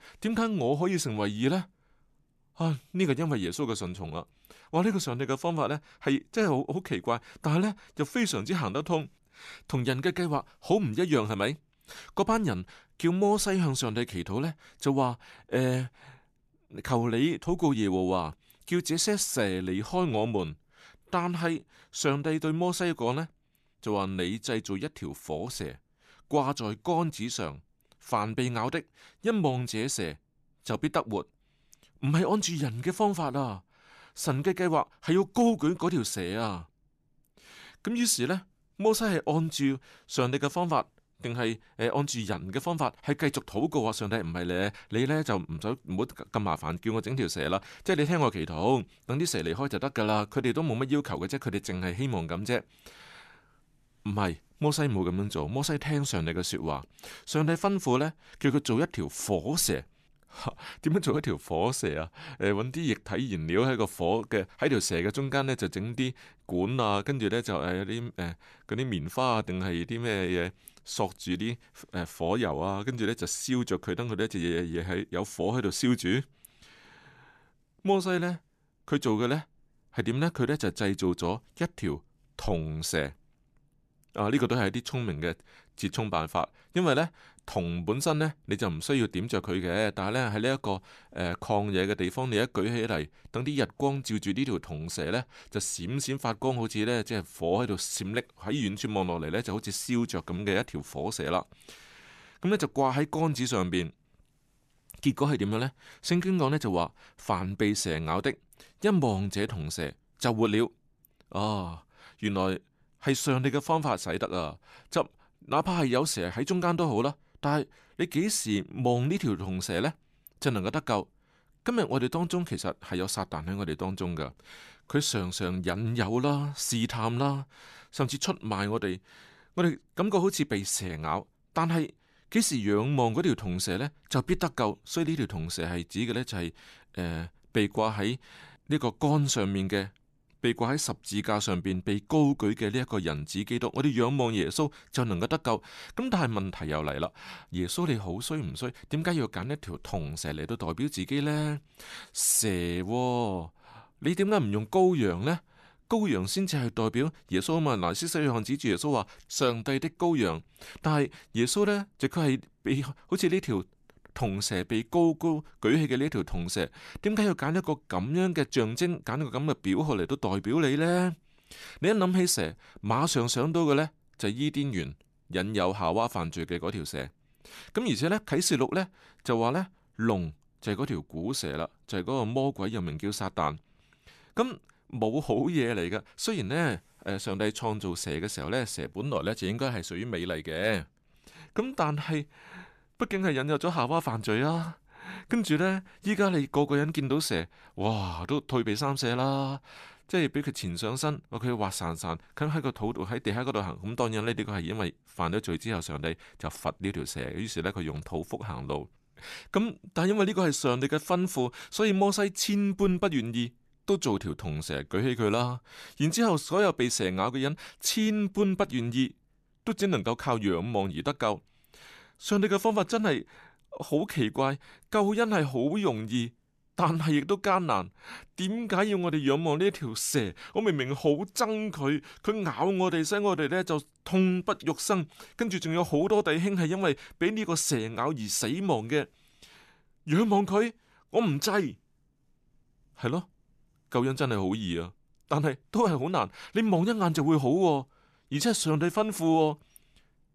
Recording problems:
none

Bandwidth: 14 kHz